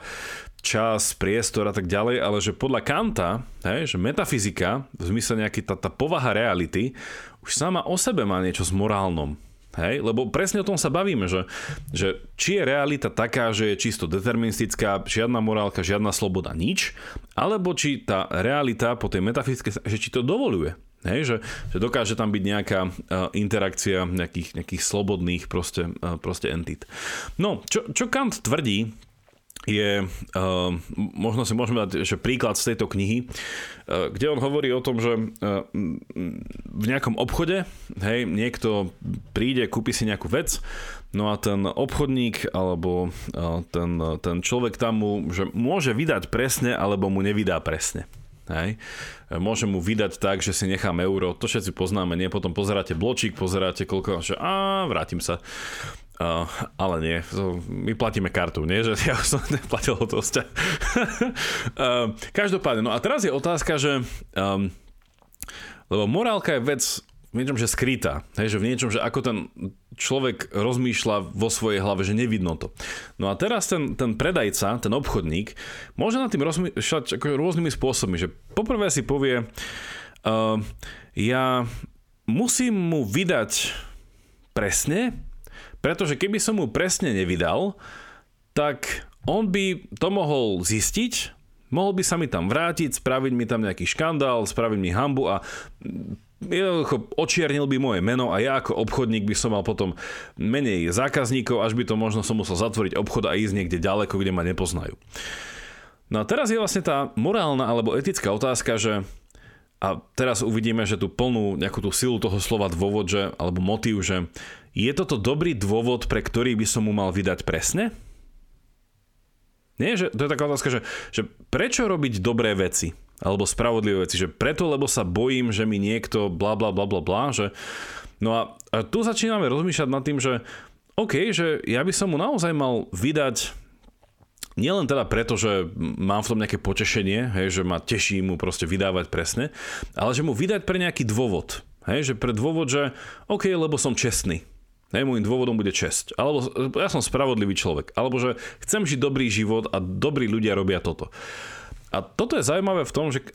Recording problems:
squashed, flat; heavily

